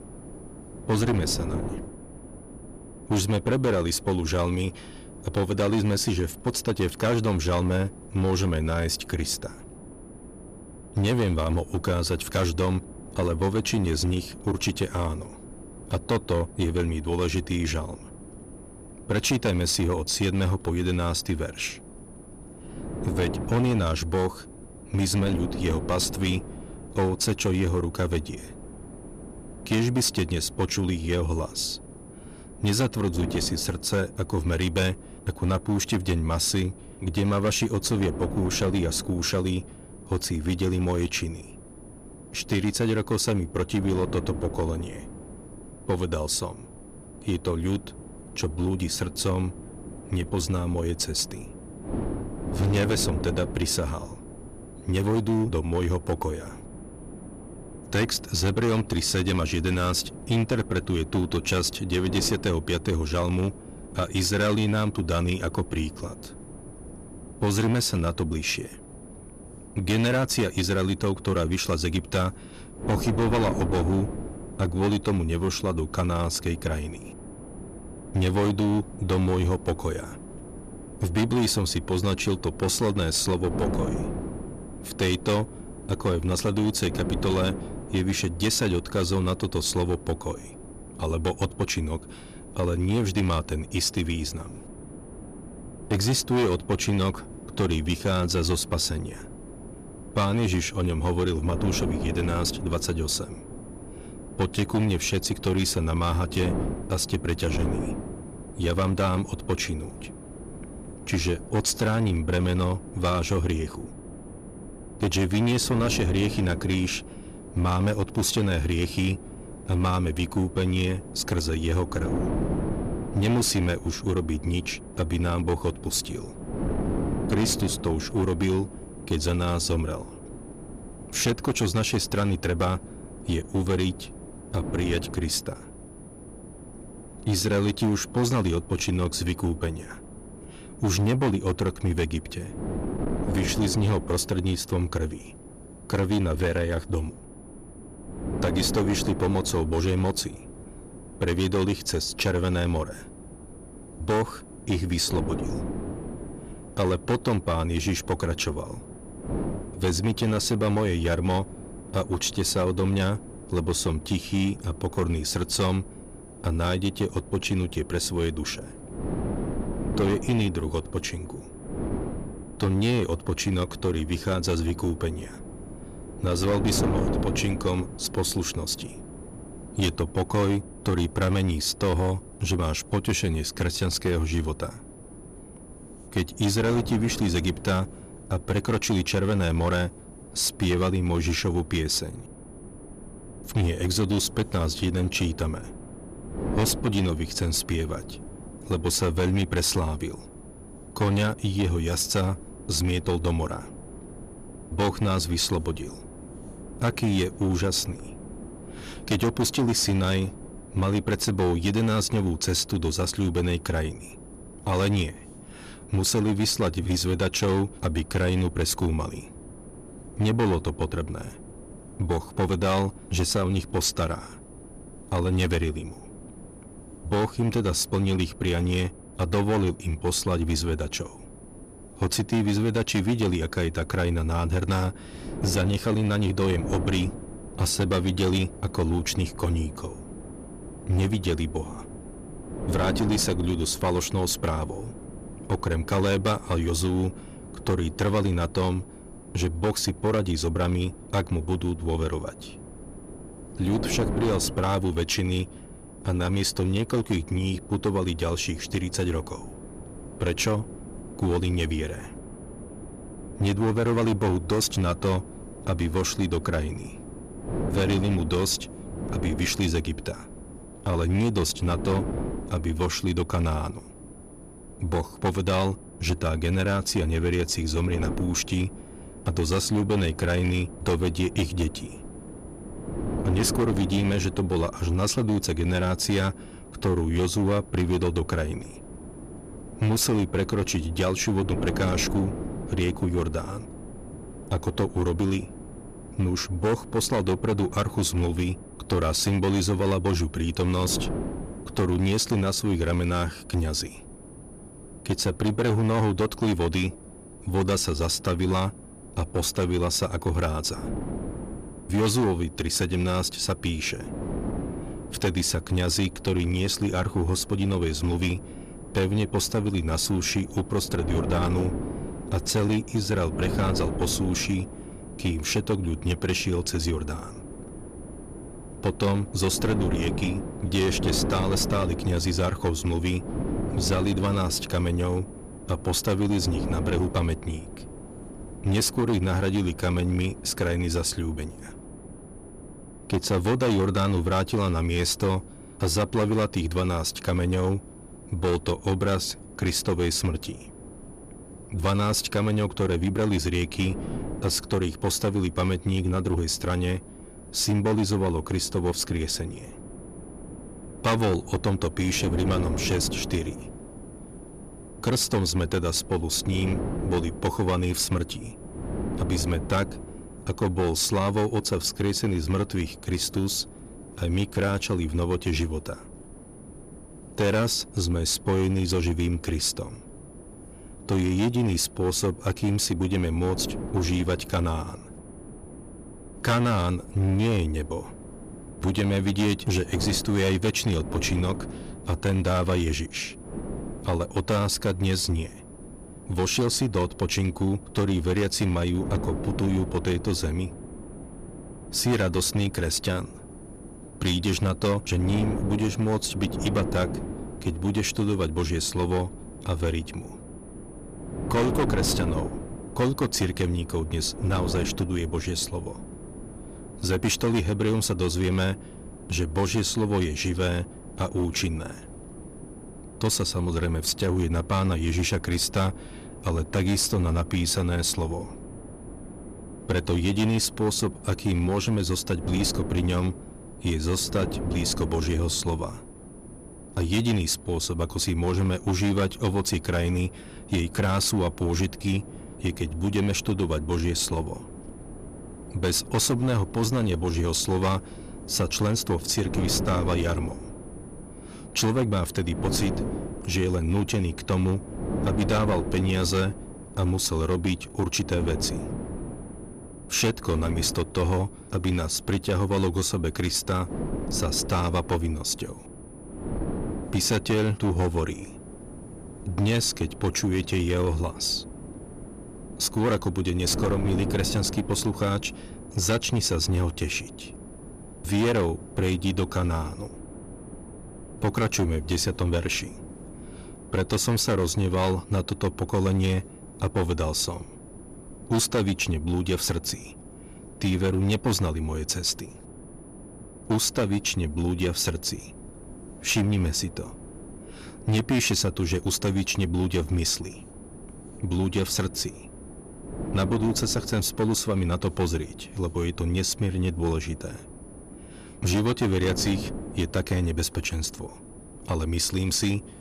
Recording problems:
distortion; slight; 8% of the sound clipped
wind noise on the microphone; occasional gusts; 15 dB below the speech
high-pitched whine; faint; throughout; 10 kHz, 25 dB below the speech

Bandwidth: 14.5 kHz